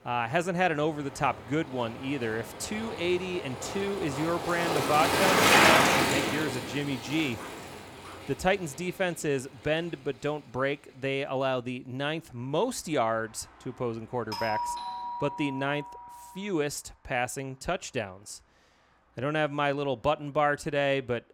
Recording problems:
traffic noise; very loud; throughout; 4 dB above the speech
dog barking; faint; at 7.5 s; peak 15 dB below the speech
doorbell; noticeable; from 14 to 16 s; peak 2 dB below the speech

